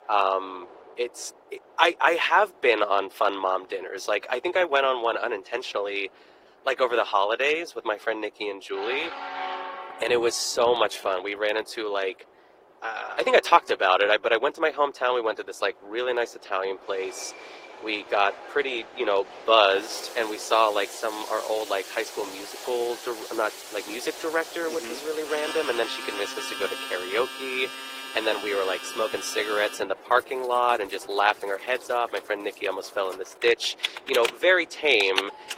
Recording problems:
thin; very; fading below 350 Hz
garbled, watery; slightly; nothing above 15.5 kHz
train or aircraft noise; noticeable; throughout; 20 dB below the speech
household noises; noticeable; from 20 s on; 10 dB below the speech

